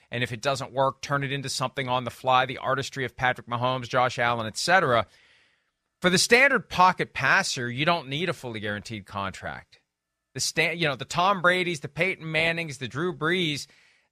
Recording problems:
none

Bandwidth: 14.5 kHz